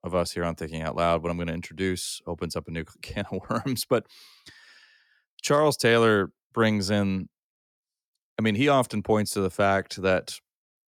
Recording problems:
none

